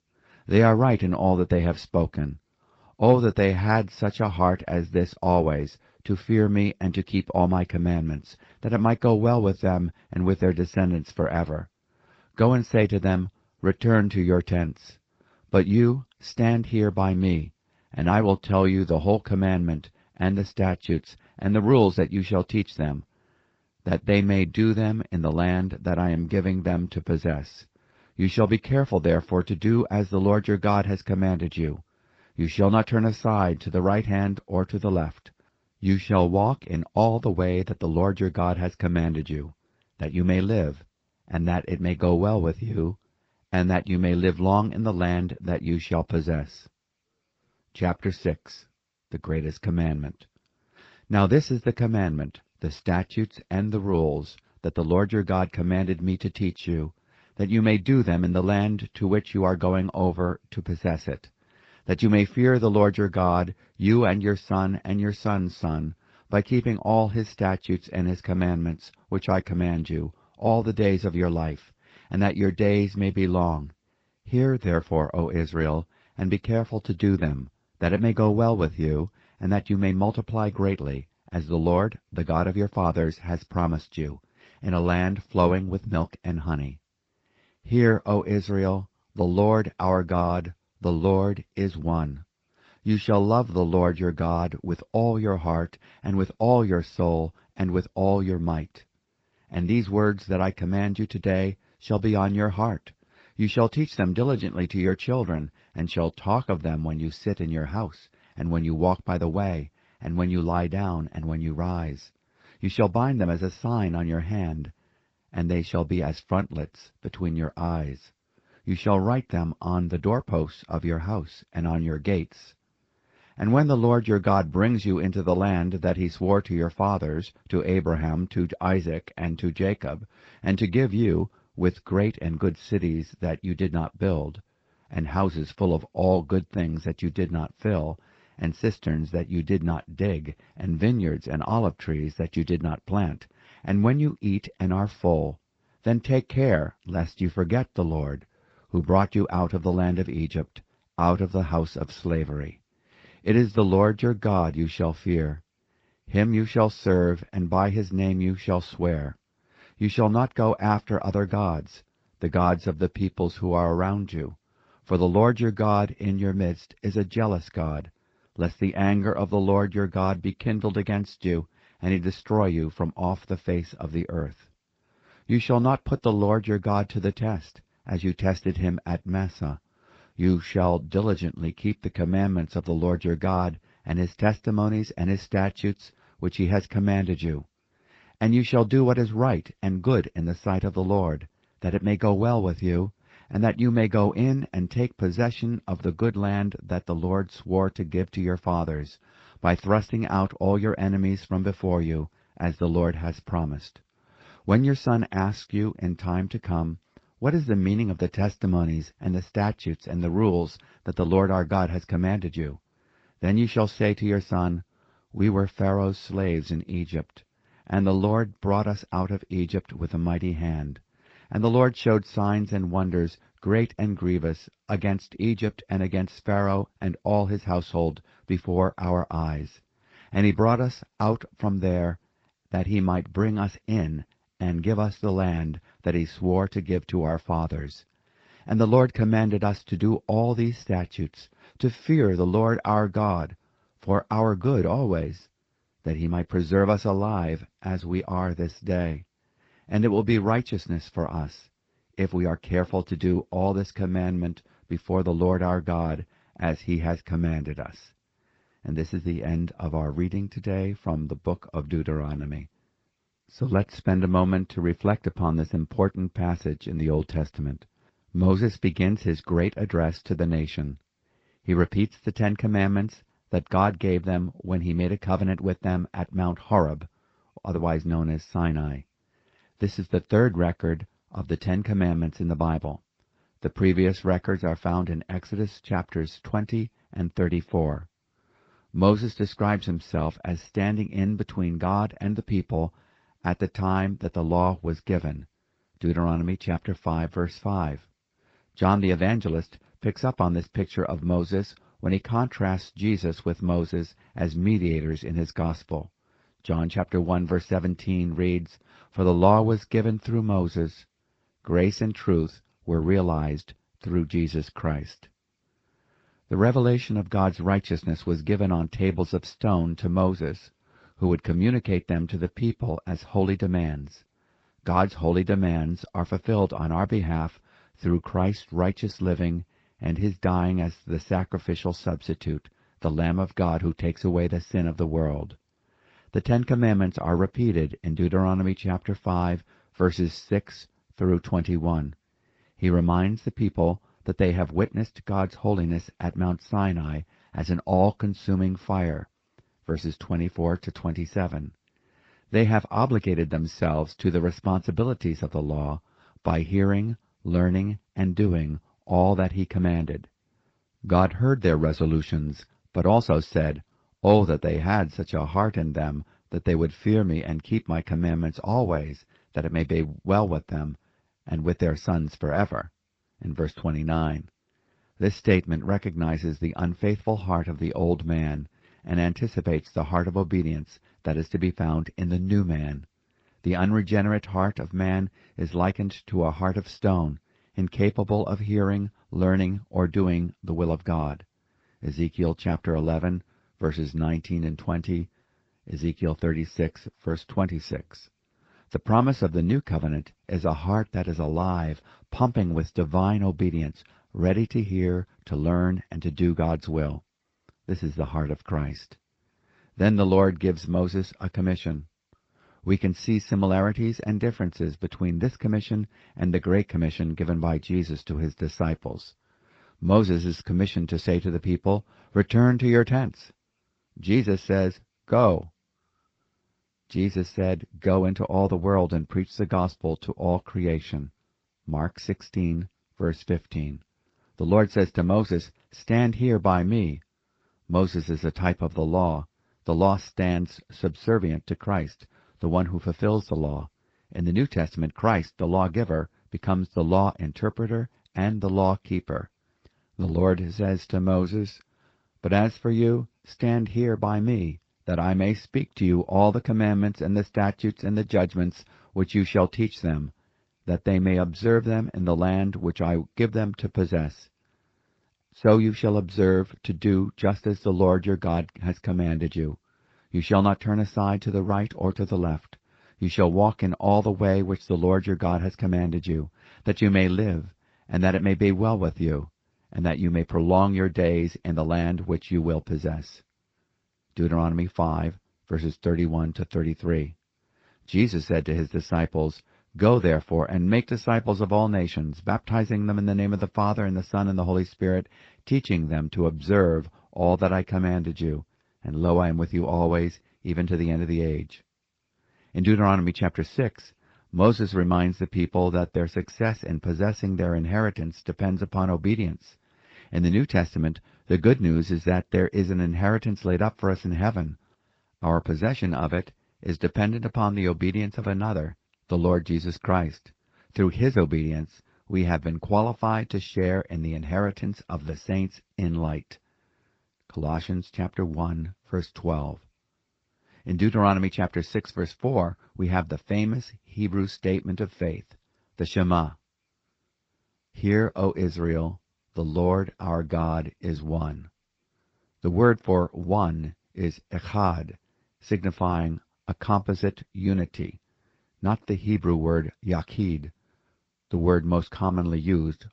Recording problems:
garbled, watery; slightly; nothing above 8 kHz

